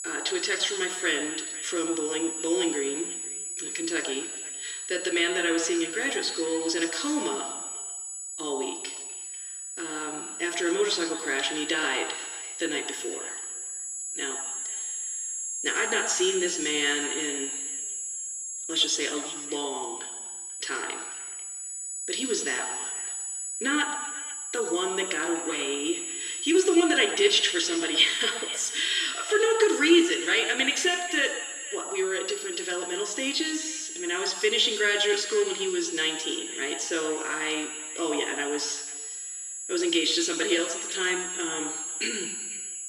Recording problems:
thin; somewhat; fading below 300 Hz
echo of what is said; faint; throughout; 490 ms later, 20 dB below the speech
room echo; slight; dies away in 1.2 s
off-mic speech; somewhat distant
high-pitched whine; loud; throughout; 8 kHz, 6 dB below the speech

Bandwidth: 14.5 kHz